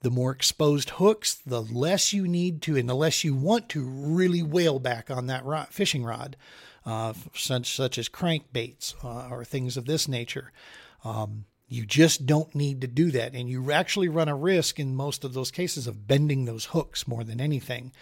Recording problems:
none

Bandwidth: 16 kHz